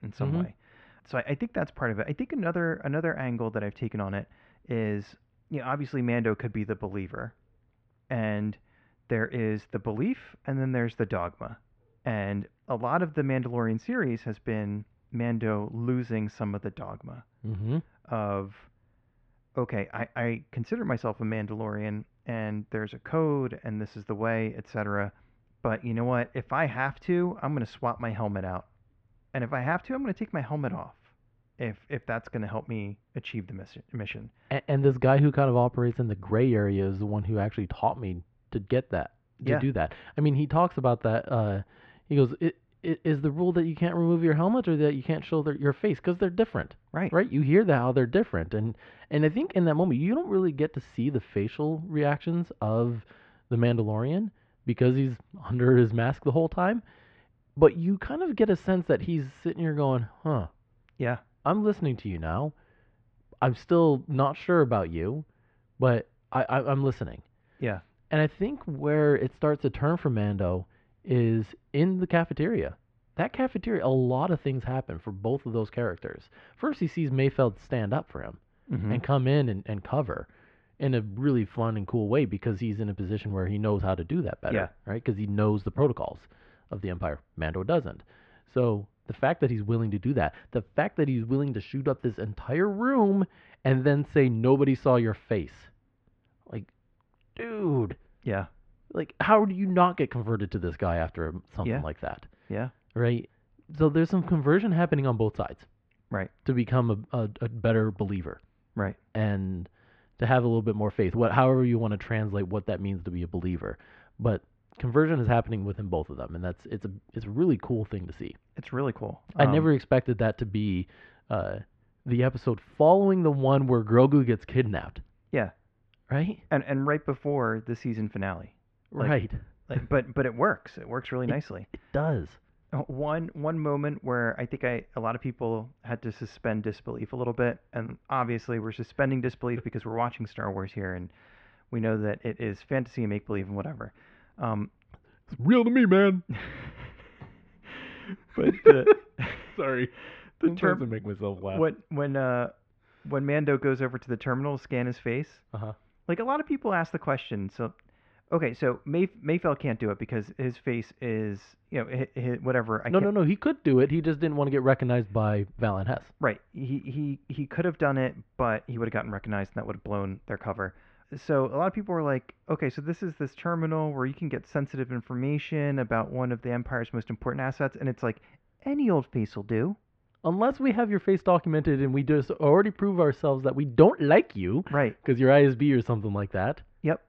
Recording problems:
muffled; very; fading above 2 kHz

